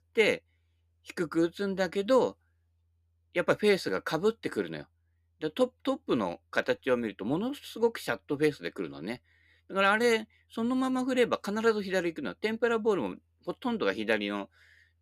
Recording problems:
none

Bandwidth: 14.5 kHz